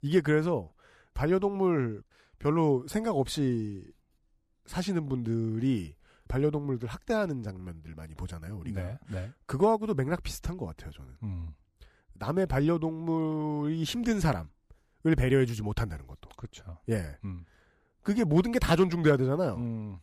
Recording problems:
none

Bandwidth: 14.5 kHz